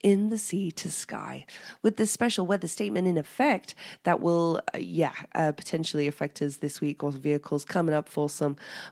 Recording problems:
garbled, watery; slightly; nothing above 16 kHz

